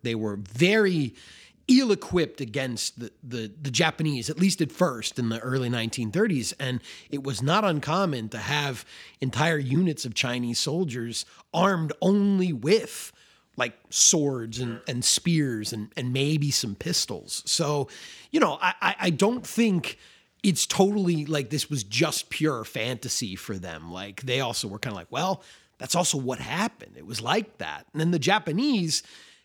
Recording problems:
none

